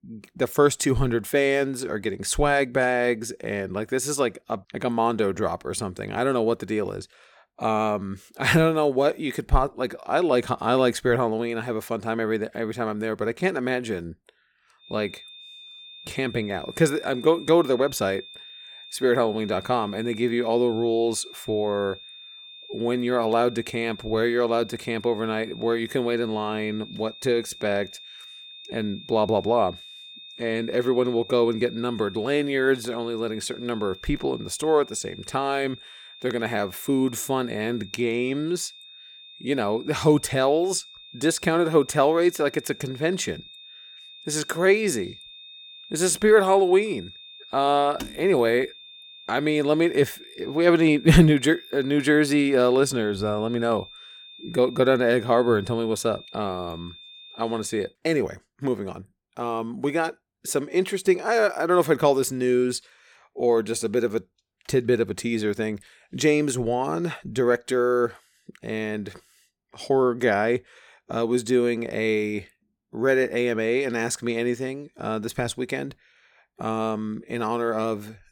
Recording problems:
high-pitched whine; noticeable; from 15 to 58 s; 3.5 kHz, 20 dB below the speech

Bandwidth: 17.5 kHz